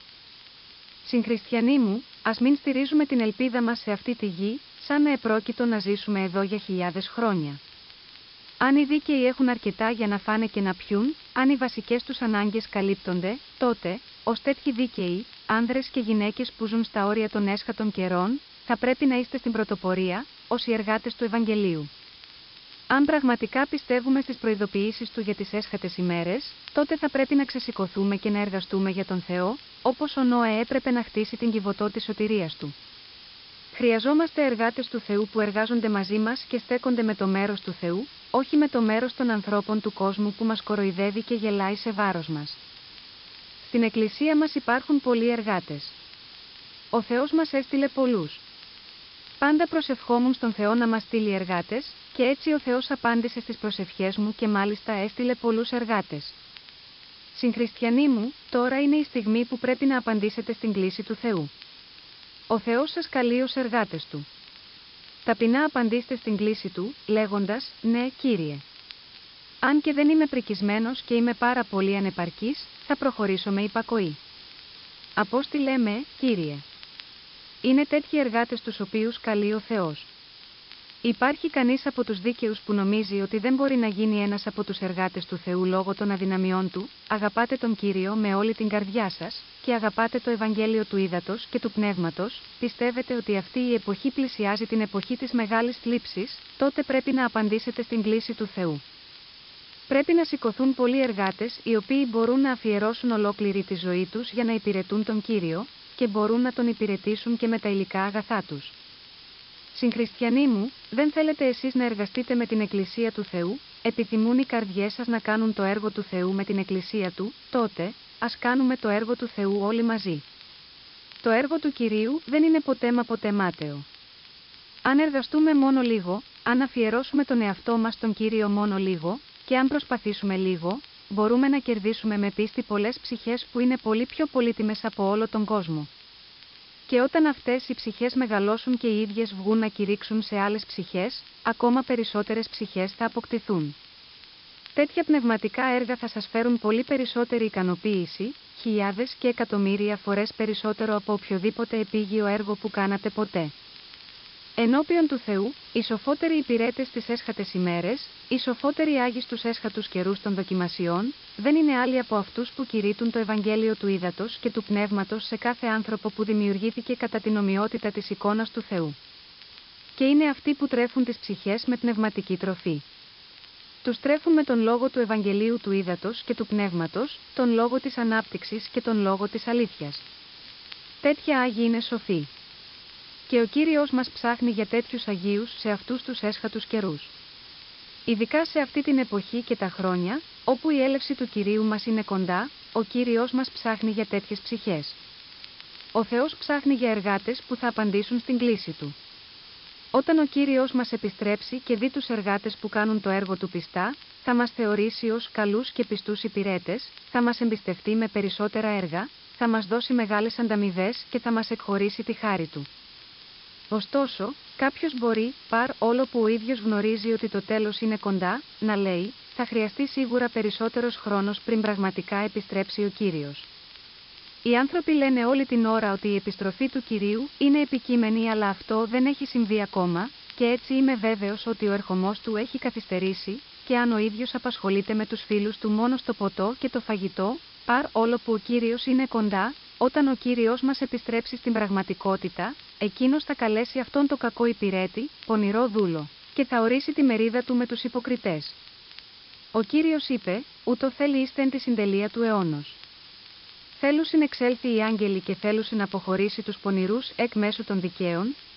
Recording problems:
high frequencies cut off; noticeable; nothing above 5 kHz
hiss; noticeable; throughout; 20 dB below the speech
crackle, like an old record; faint; 30 dB below the speech

